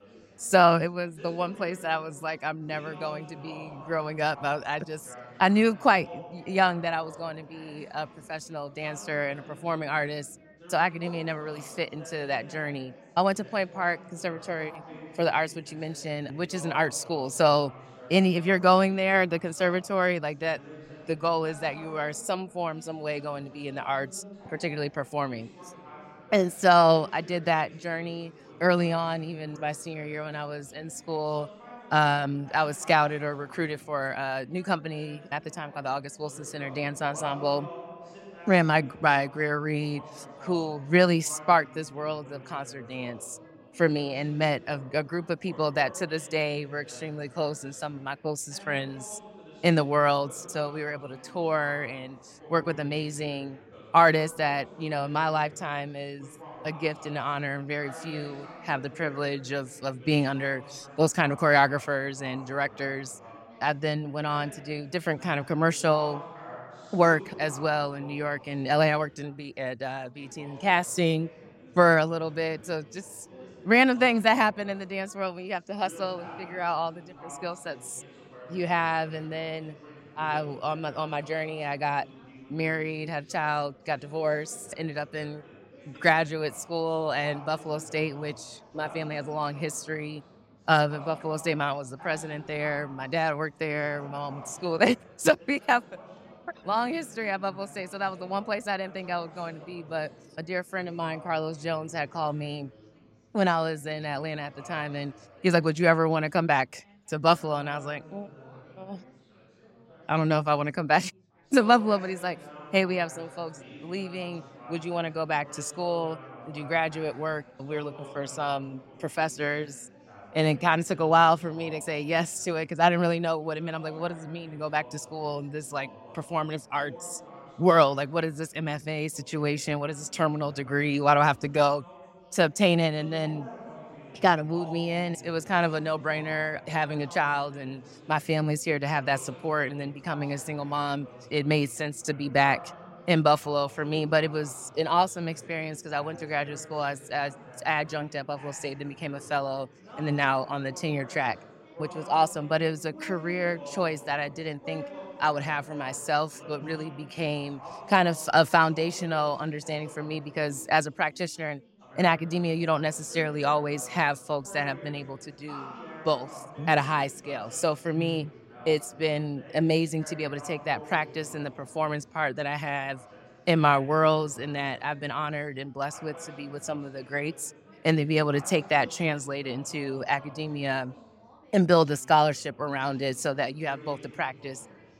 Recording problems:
background chatter; noticeable; throughout; 4 voices, 20 dB below the speech

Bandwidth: 16 kHz